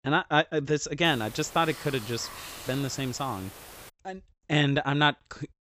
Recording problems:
high frequencies cut off; noticeable; nothing above 8 kHz
hiss; noticeable; from 1 to 4 s; 15 dB below the speech

